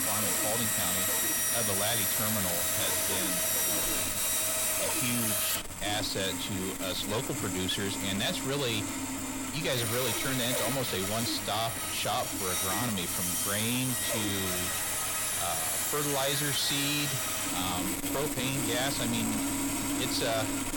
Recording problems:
distortion; heavy; 6 dB below the speech
machinery noise; very loud; throughout; 3 dB above the speech

